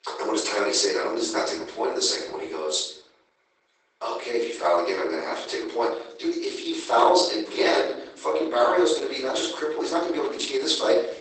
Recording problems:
off-mic speech; far
garbled, watery; badly; nothing above 8 kHz
thin; very; fading below 350 Hz
room echo; noticeable; dies away in 0.7 s

